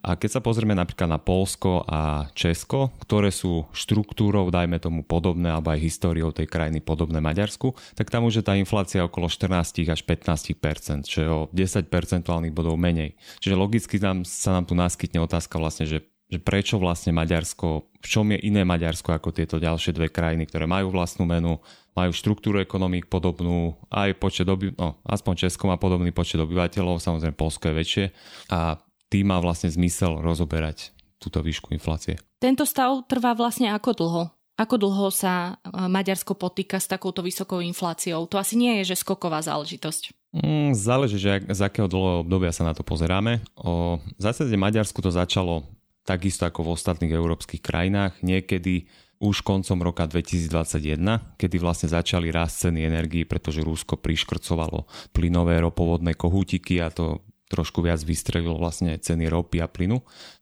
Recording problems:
none

